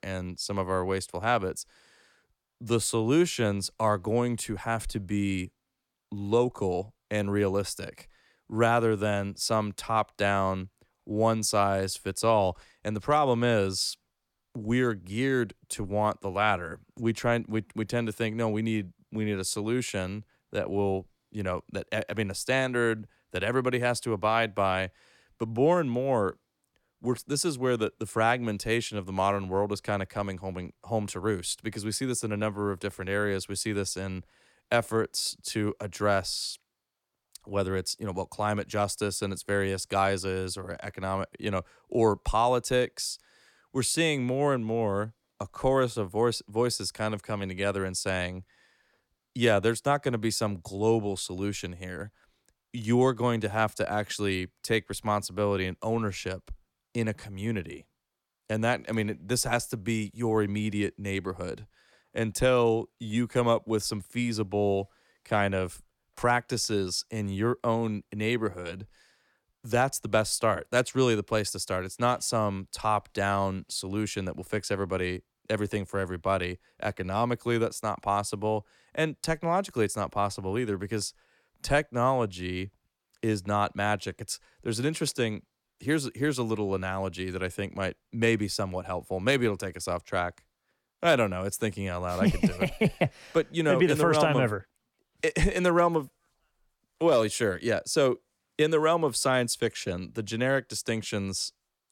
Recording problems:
none

